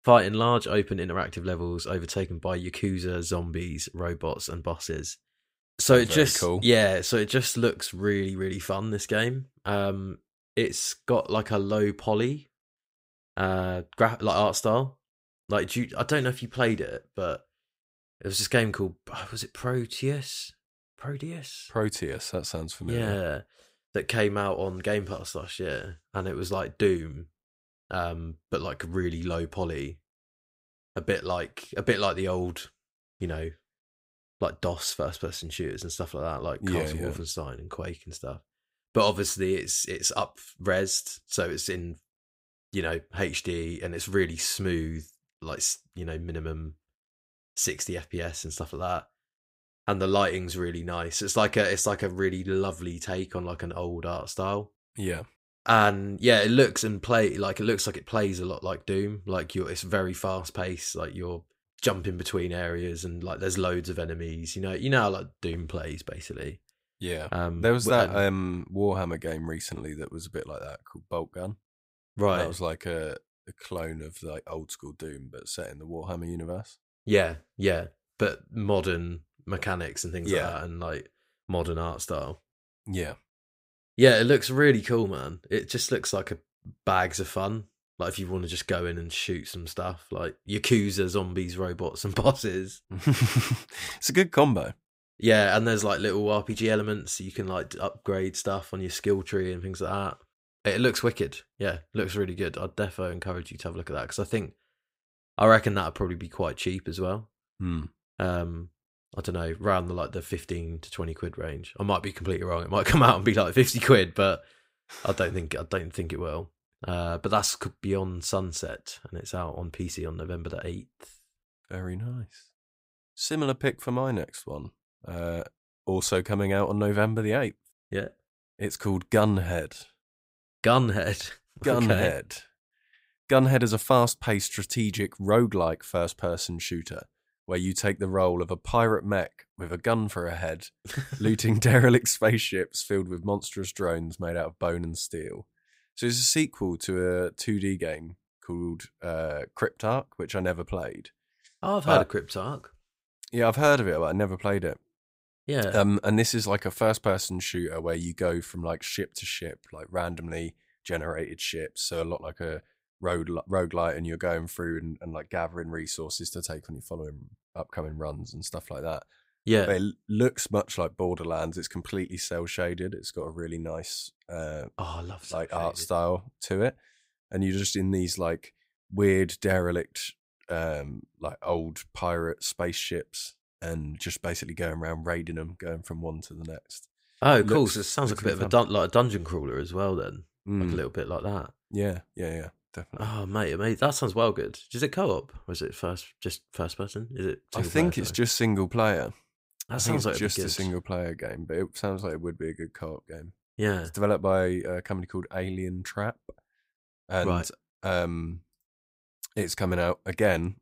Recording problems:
none

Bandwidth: 15.5 kHz